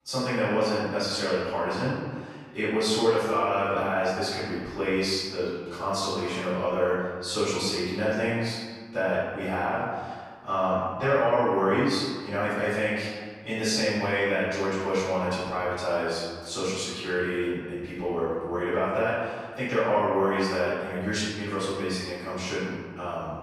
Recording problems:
room echo; strong; dies away in 1.6 s
off-mic speech; far

